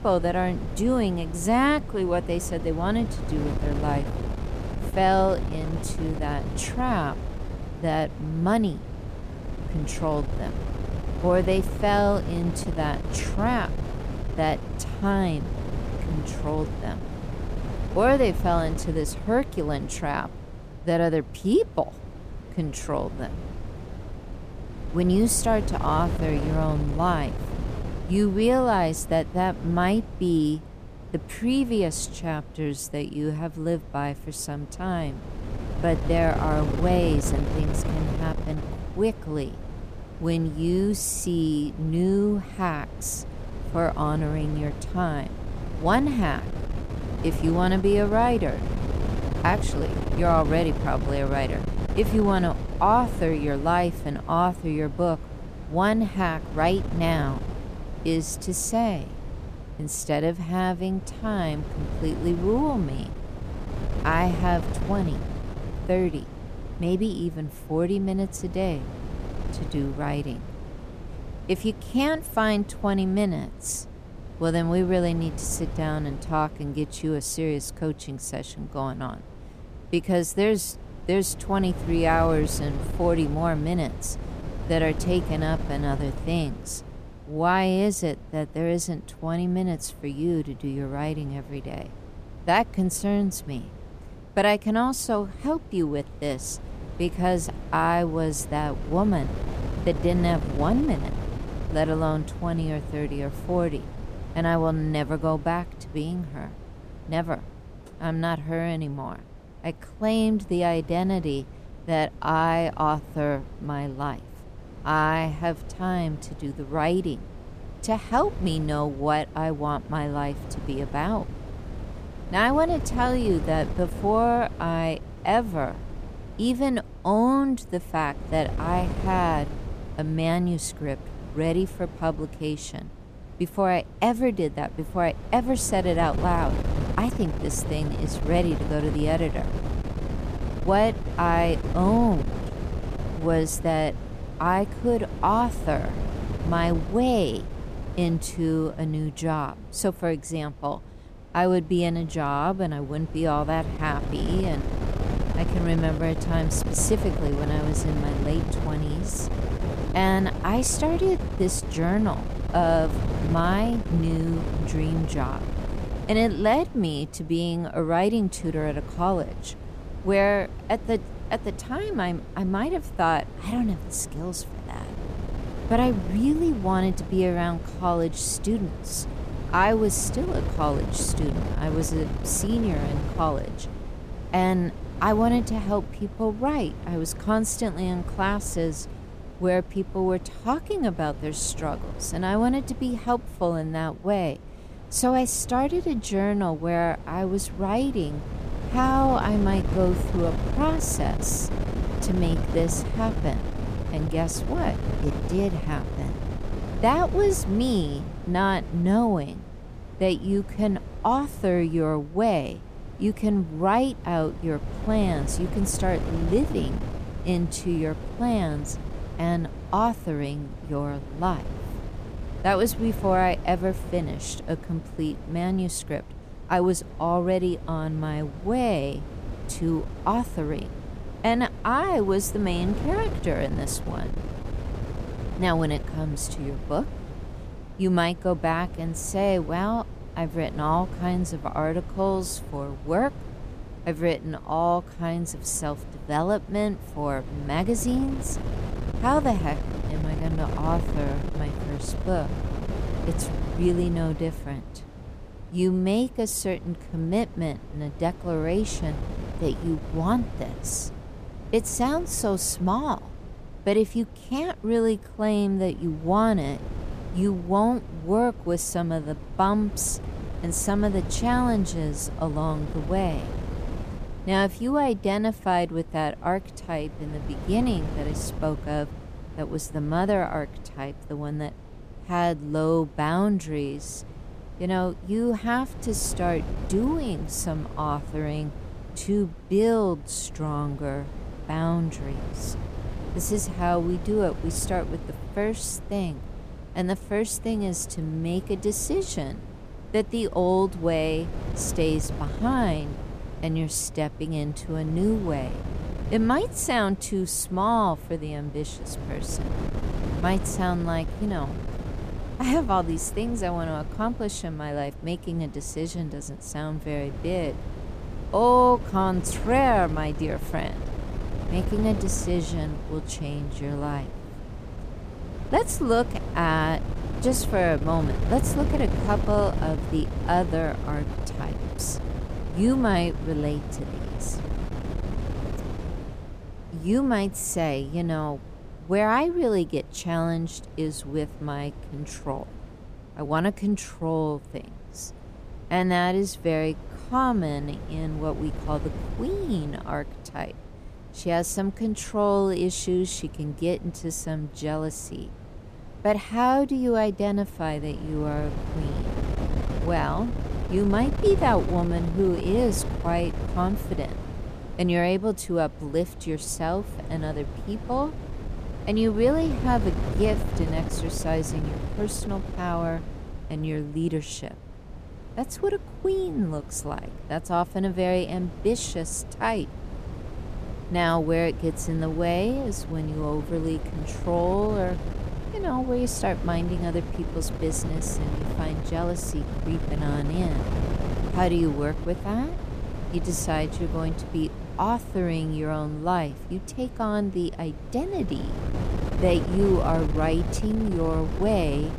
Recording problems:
wind noise on the microphone; occasional gusts; 15 dB below the speech

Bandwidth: 14.5 kHz